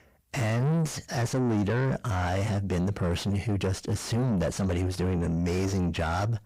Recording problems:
distortion; heavy; 7 dB below the speech

